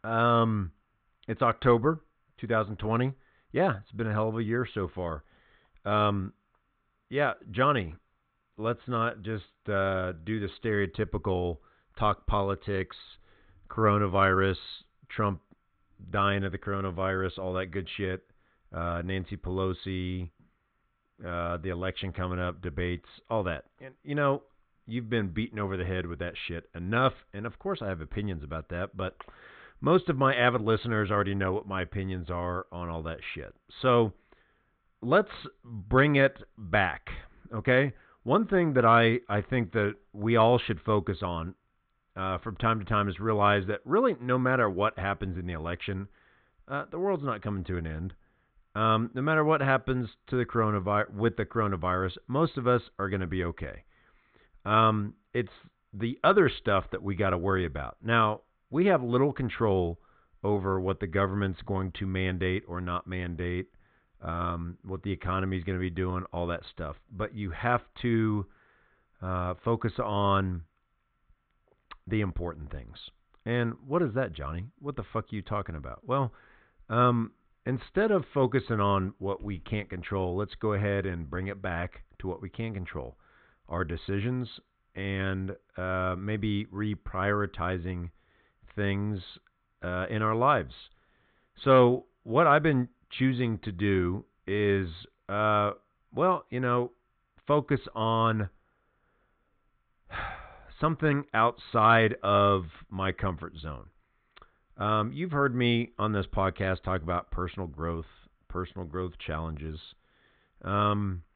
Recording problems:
high frequencies cut off; severe; nothing above 4 kHz

